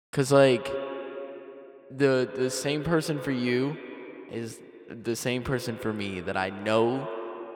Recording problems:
echo of what is said; noticeable; throughout; 130 ms later, 15 dB below the speech

